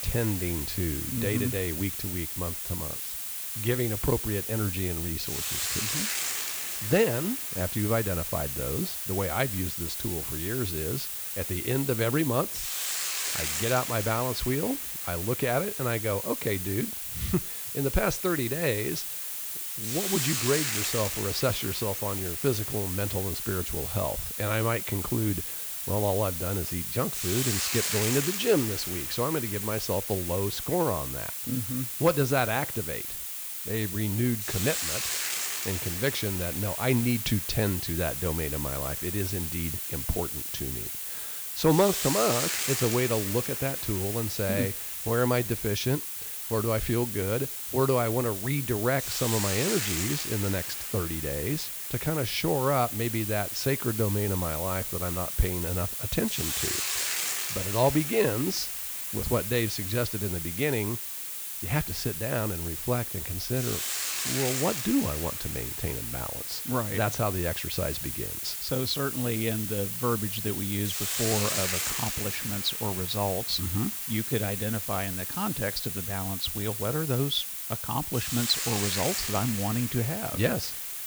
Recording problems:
hiss; loud; throughout; 1 dB below the speech

